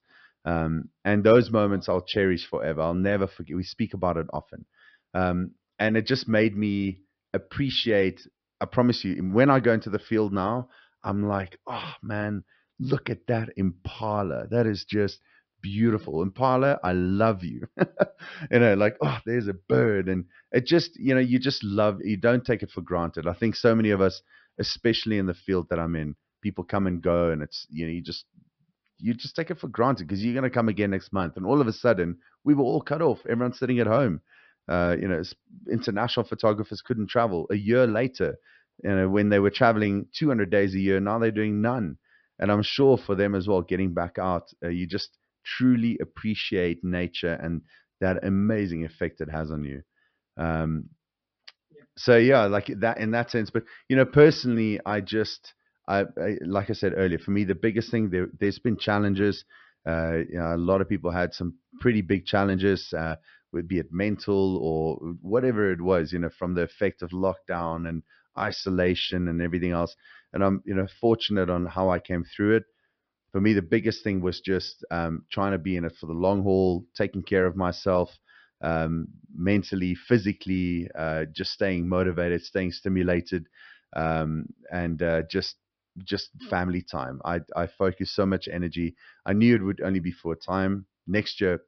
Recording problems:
high frequencies cut off; noticeable; nothing above 5.5 kHz

